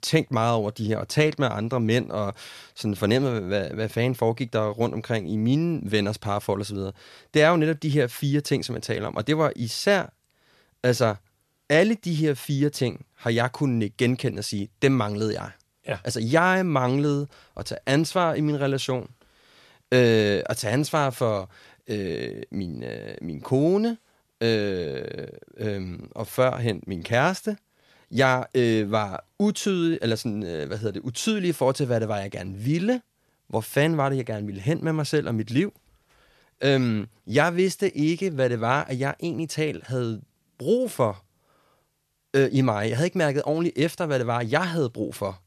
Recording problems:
none

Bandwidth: 13.5 kHz